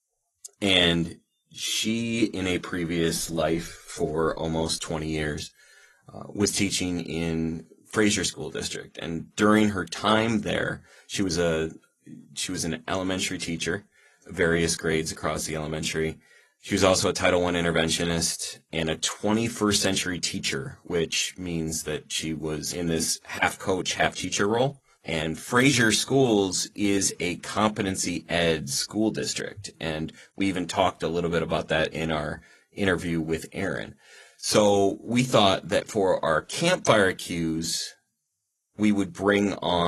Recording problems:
garbled, watery; slightly; nothing above 12 kHz
abrupt cut into speech; at the end

